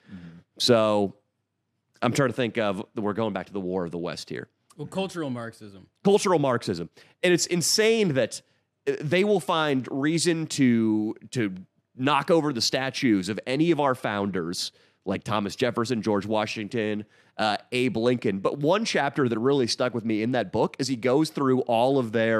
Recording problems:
abrupt cut into speech; at the end

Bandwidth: 14 kHz